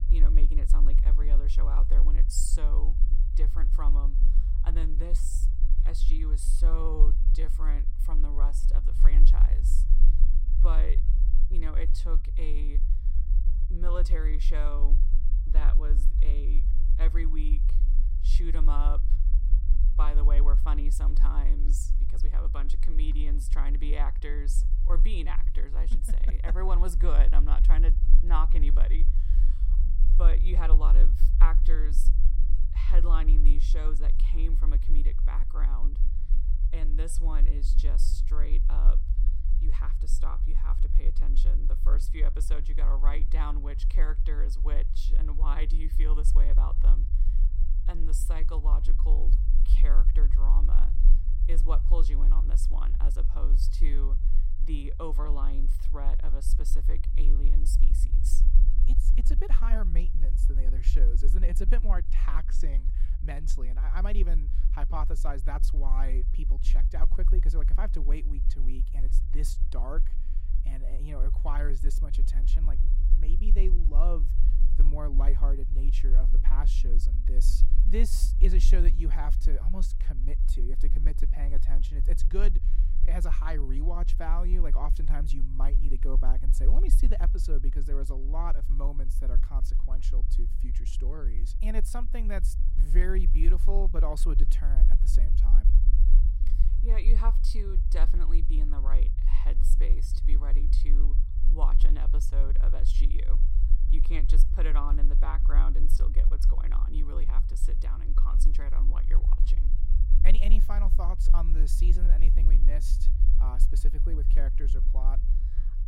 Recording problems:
low rumble; loud; throughout; 10 dB below the speech

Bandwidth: 16 kHz